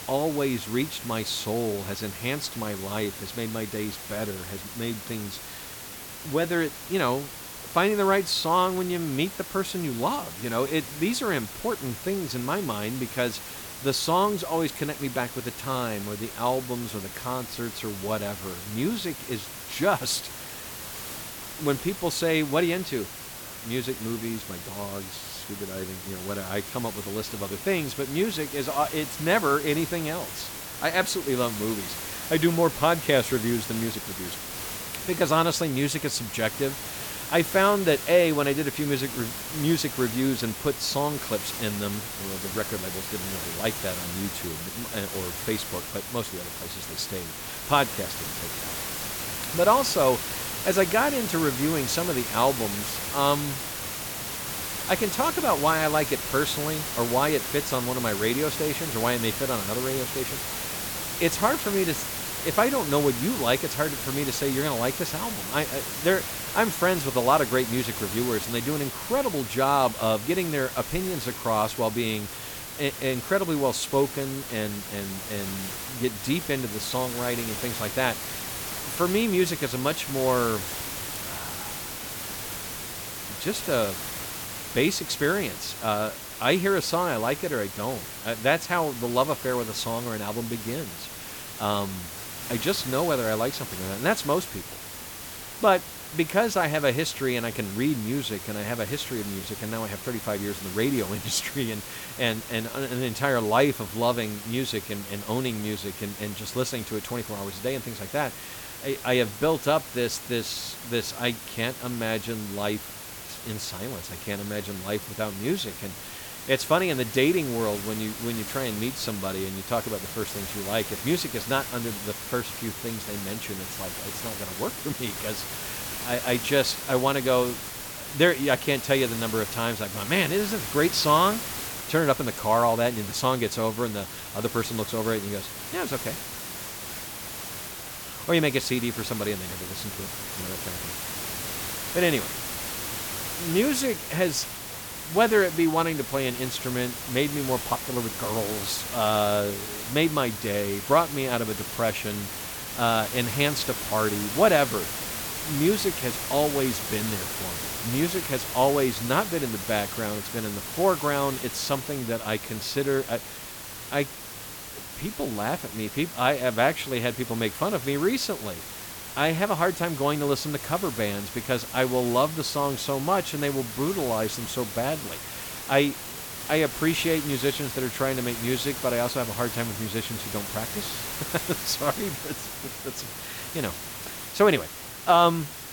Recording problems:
hiss; loud; throughout; 6 dB below the speech

